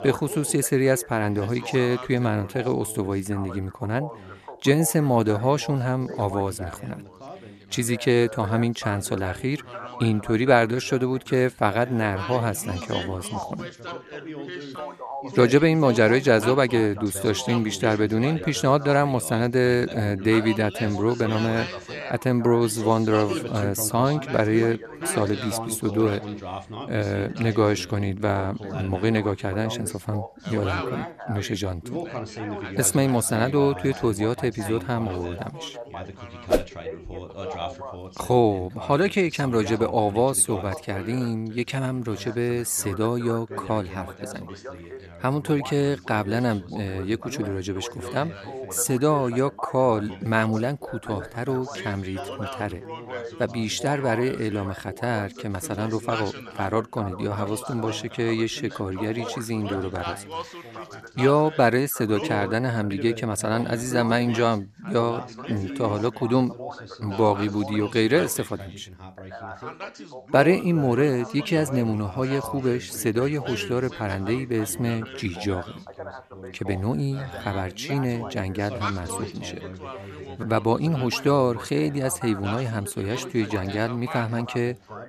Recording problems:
background chatter; noticeable; throughout; 3 voices, 10 dB below the speech

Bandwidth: 13.5 kHz